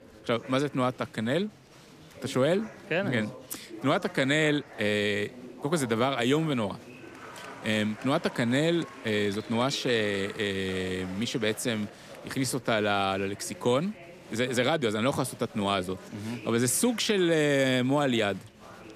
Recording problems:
chatter from many people; noticeable; throughout; 20 dB below the speech

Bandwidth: 14.5 kHz